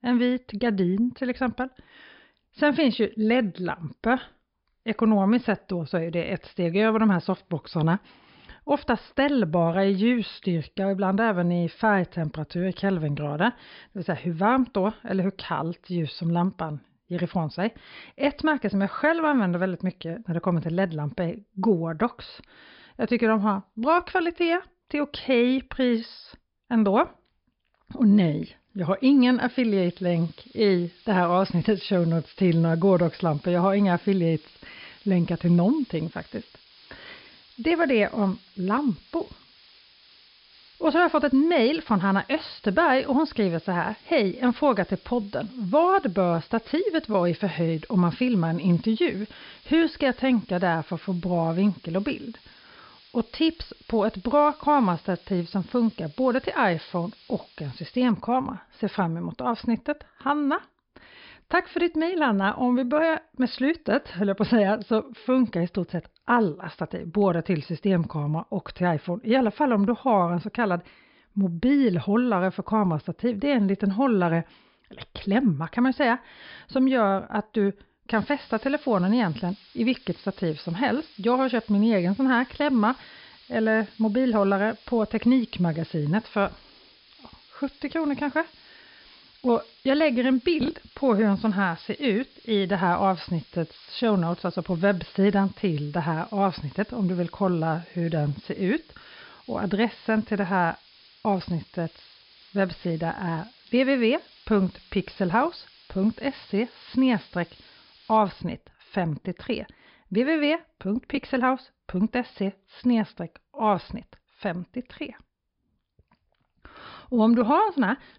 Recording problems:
high frequencies cut off; noticeable; nothing above 5.5 kHz
hiss; faint; from 30 to 58 s and from 1:18 to 1:48; 25 dB below the speech

